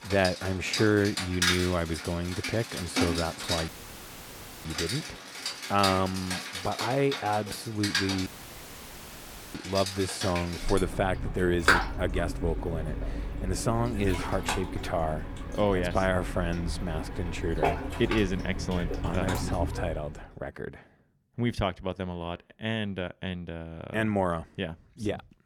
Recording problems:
rain or running water; loud; until 20 s; 2 dB below the speech
audio cutting out; filled with static; at 3.5 s for 1 s and at 8.5 s for 1.5 s

